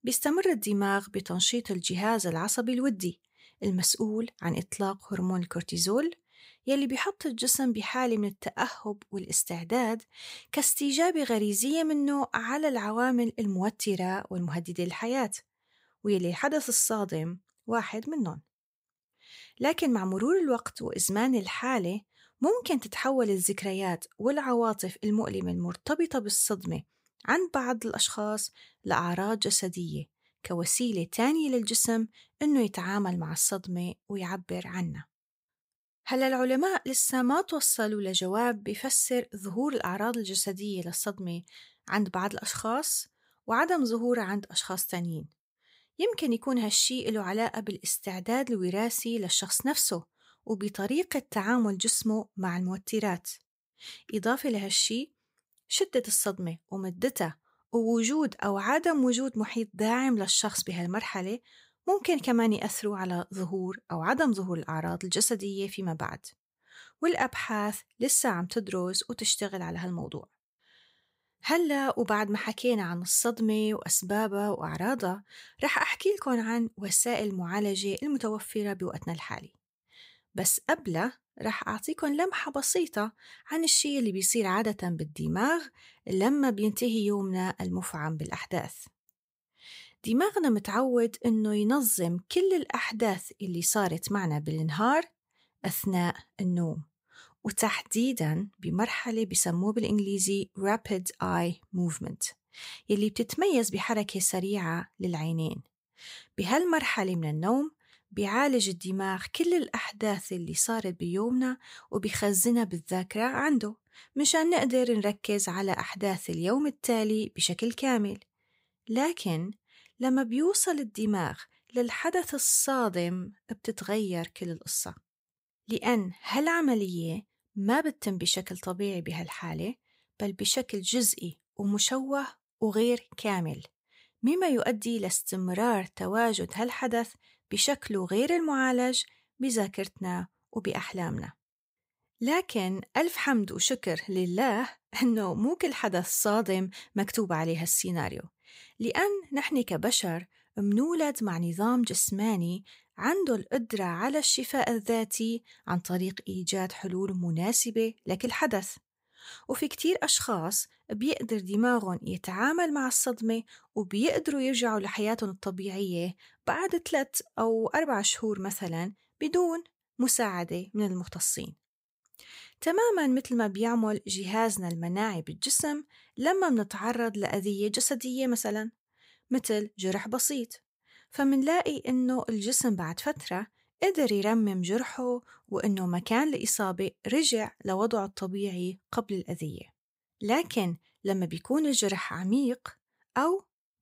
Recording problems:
none

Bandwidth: 15.5 kHz